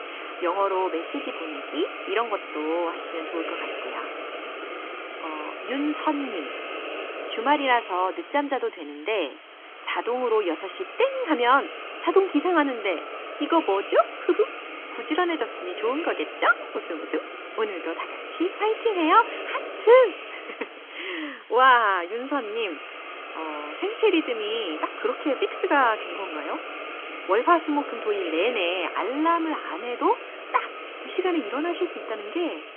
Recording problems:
phone-call audio; nothing above 3.5 kHz
hiss; loud; throughout; 10 dB below the speech

